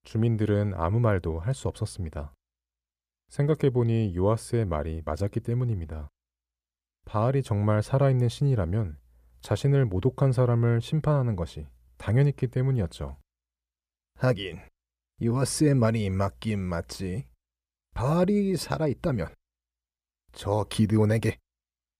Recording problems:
none

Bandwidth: 14.5 kHz